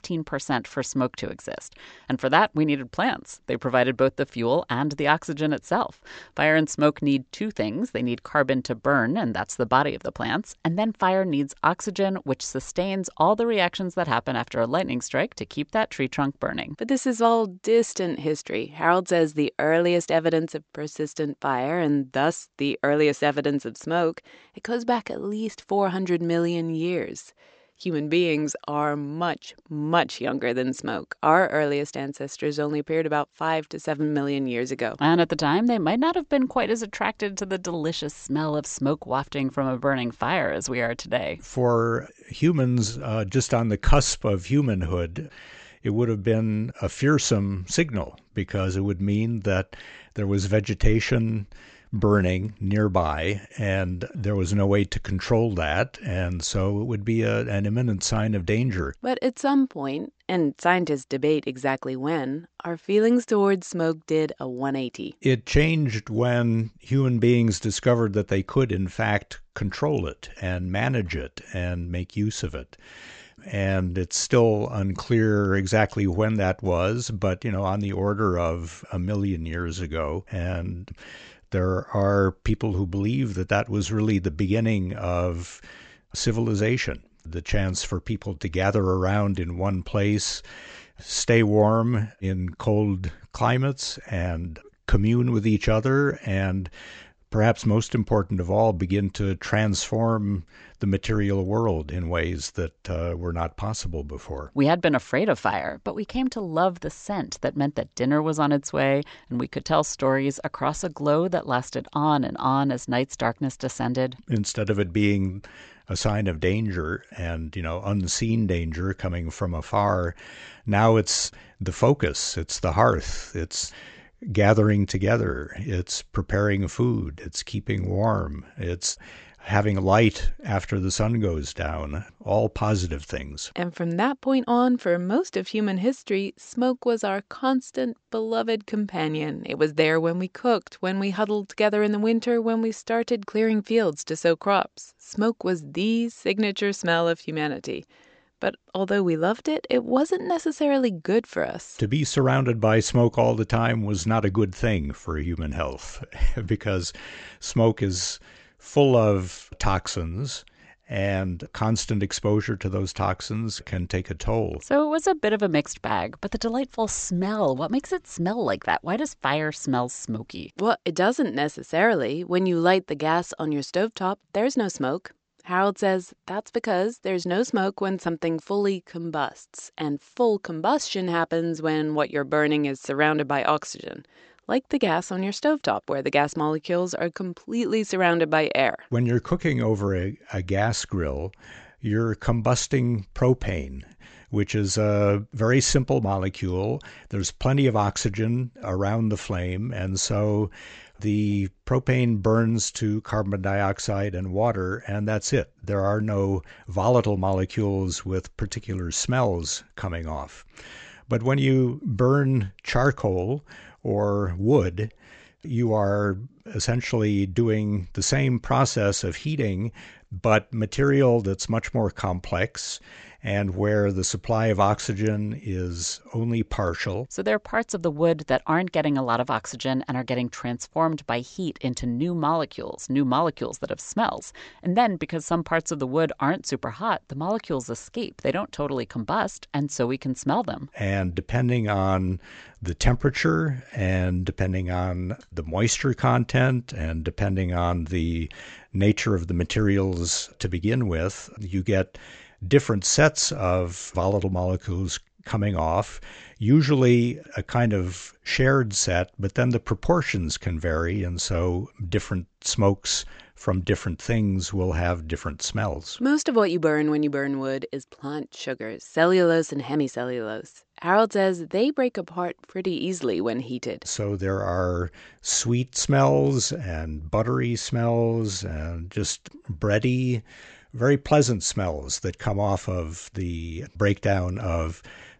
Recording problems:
high frequencies cut off; noticeable; nothing above 8 kHz

